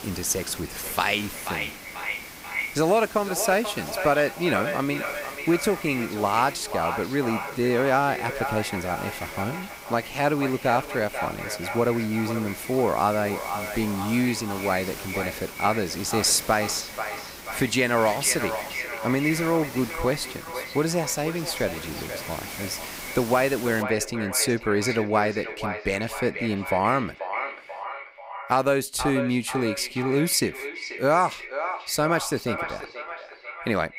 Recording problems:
echo of what is said; strong; throughout; 490 ms later, 8 dB below the speech
hiss; noticeable; until 24 s; 15 dB below the speech

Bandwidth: 15.5 kHz